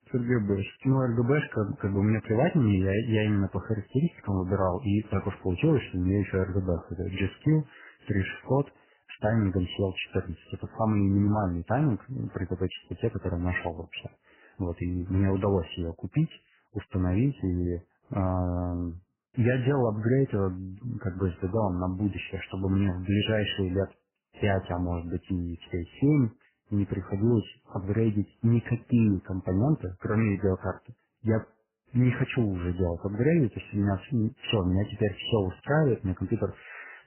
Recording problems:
garbled, watery; badly; nothing above 3 kHz

